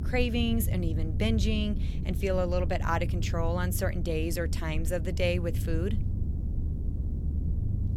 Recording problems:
low rumble; noticeable; throughout; 15 dB below the speech

